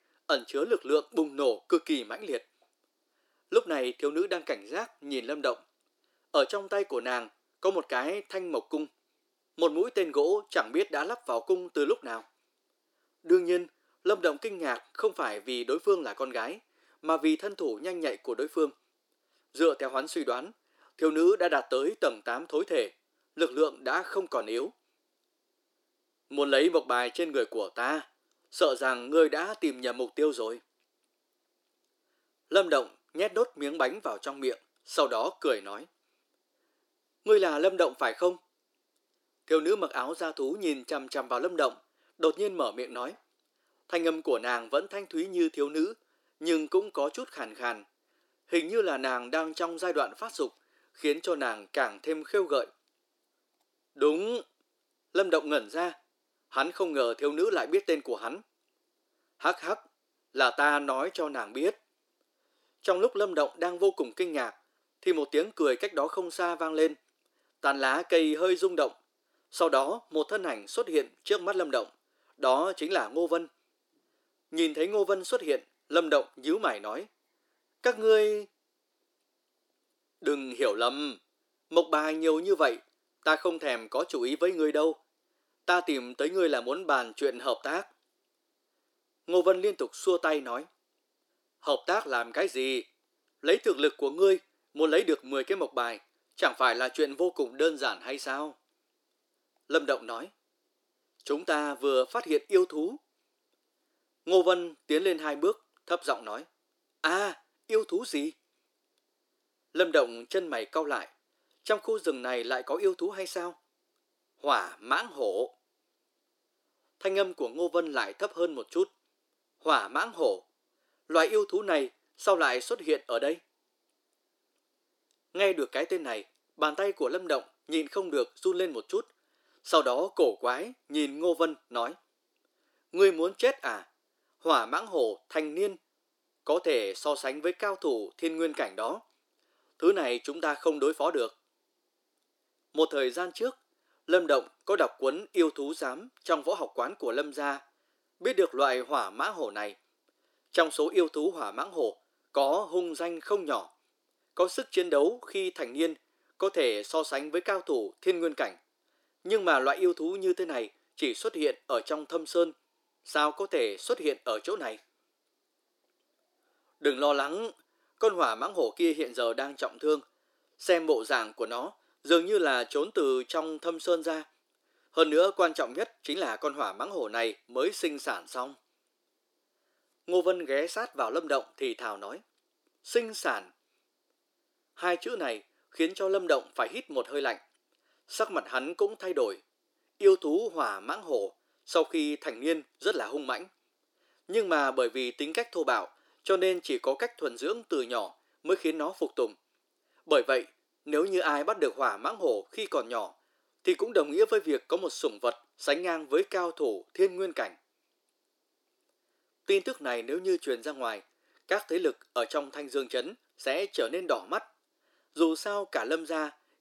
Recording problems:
thin; somewhat; fading below 300 Hz

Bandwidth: 17 kHz